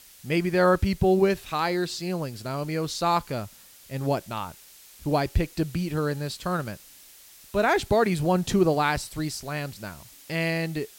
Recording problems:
hiss; faint; throughout; 20 dB below the speech

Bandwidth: 16.5 kHz